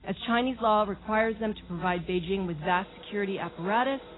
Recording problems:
garbled, watery; badly; nothing above 4 kHz
machinery noise; faint; throughout; 20 dB below the speech

